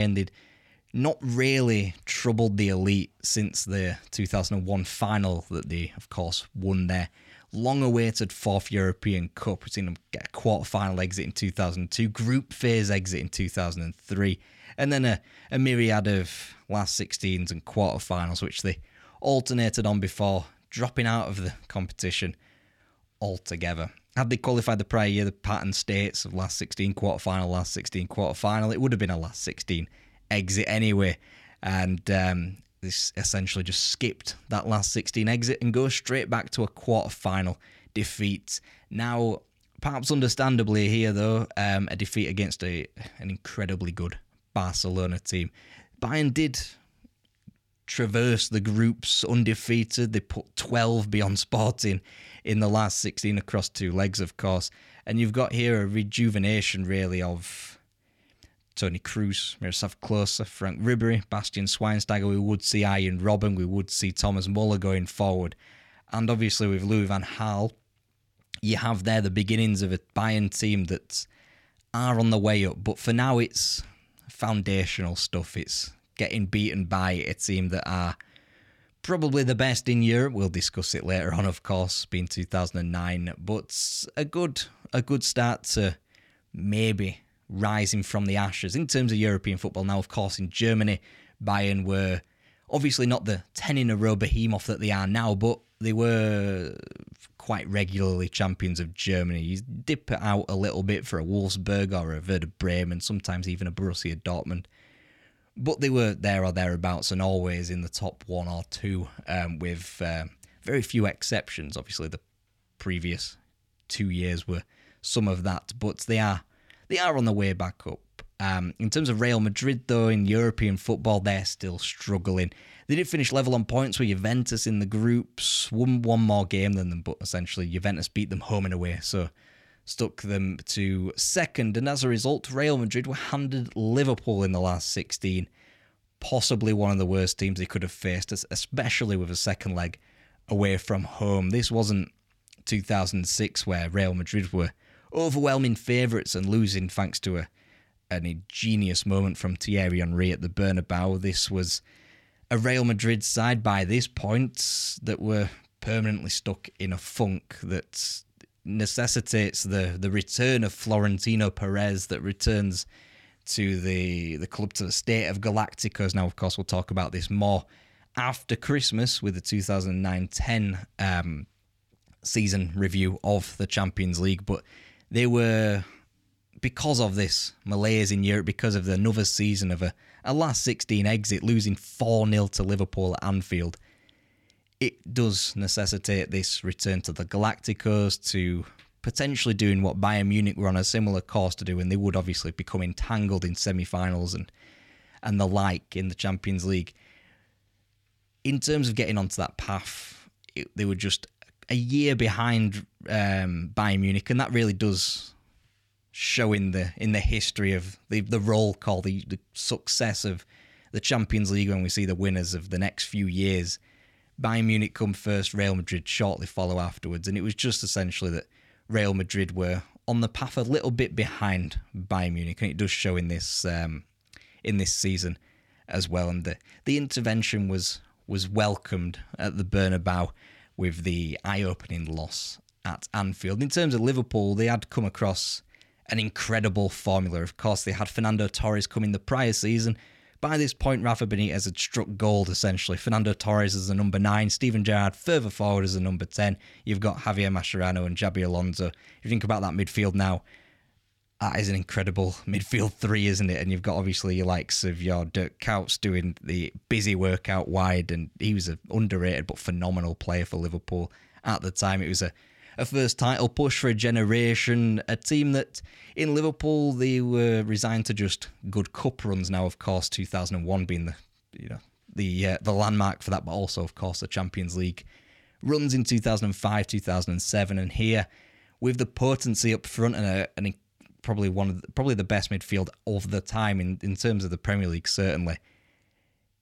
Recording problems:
abrupt cut into speech; at the start

